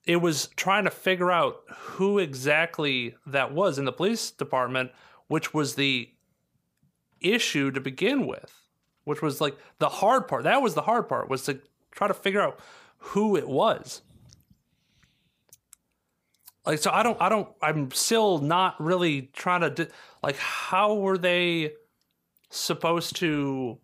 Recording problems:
none

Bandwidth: 15 kHz